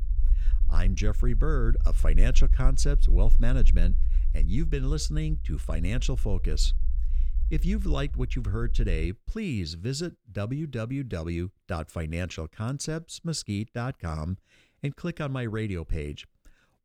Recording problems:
low rumble; noticeable; until 9 s; 15 dB below the speech

